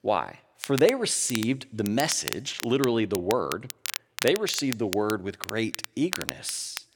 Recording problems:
crackle, like an old record; loud; 9 dB below the speech

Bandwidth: 17 kHz